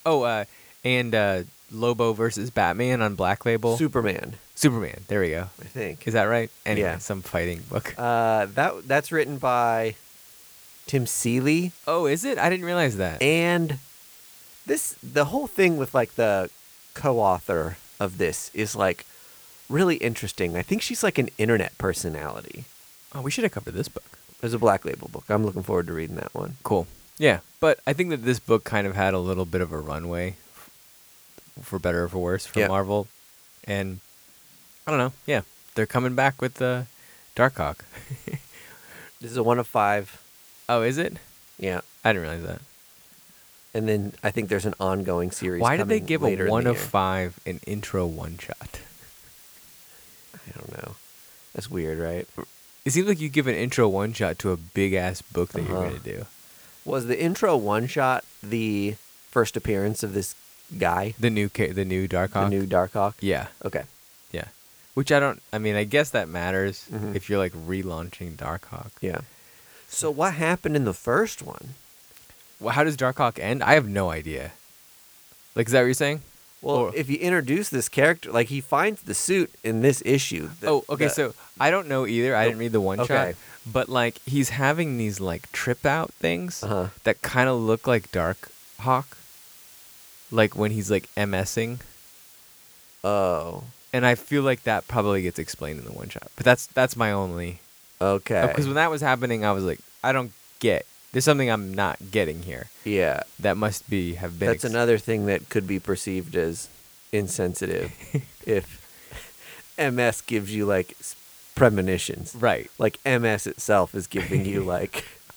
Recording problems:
hiss; faint; throughout; 25 dB below the speech

